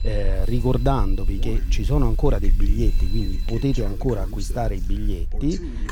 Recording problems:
voice in the background; noticeable; throughout; 15 dB below the speech
alarms or sirens; faint; throughout; 20 dB below the speech
household noises; faint; throughout; 25 dB below the speech
low rumble; faint; throughout; 20 dB below the speech

